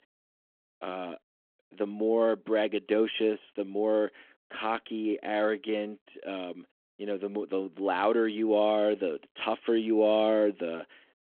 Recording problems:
phone-call audio

